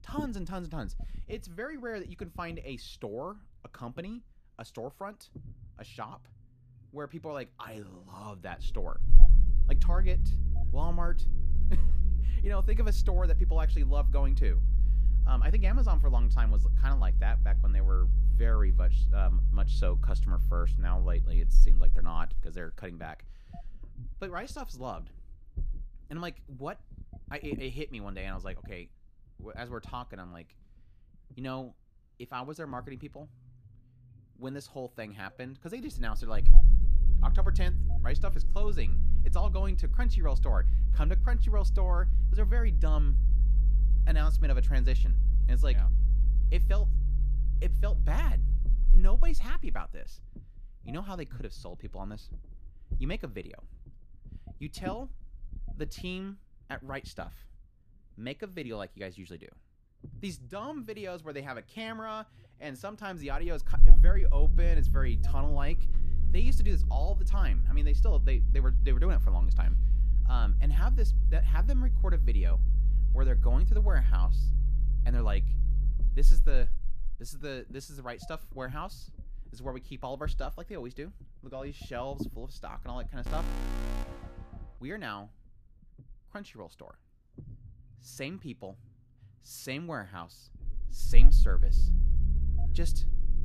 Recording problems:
low rumble; noticeable; throughout; 10 dB below the speech
alarm; loud; from 1:23 to 1:24; peak 4 dB above the speech

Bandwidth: 14.5 kHz